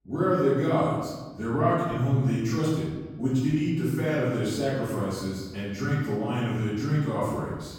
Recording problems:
room echo; strong; dies away in 1.2 s
off-mic speech; far

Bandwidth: 17 kHz